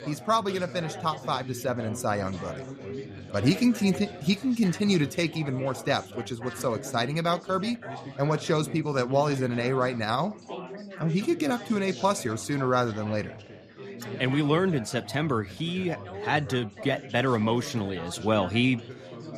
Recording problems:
chatter from many people; noticeable; throughout; 15 dB below the speech

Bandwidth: 14.5 kHz